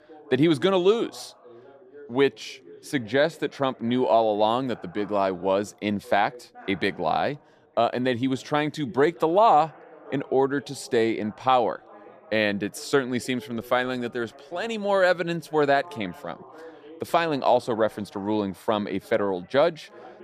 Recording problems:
background chatter; faint; throughout; 2 voices, 25 dB below the speech

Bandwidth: 14.5 kHz